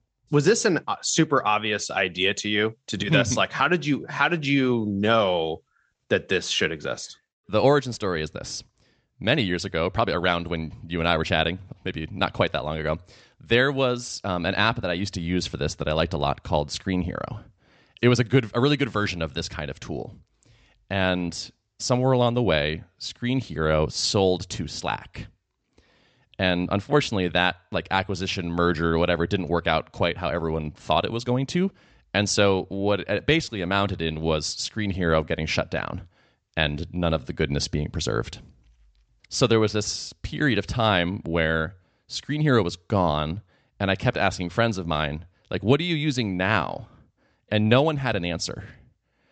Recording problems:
high frequencies cut off; noticeable; nothing above 8 kHz

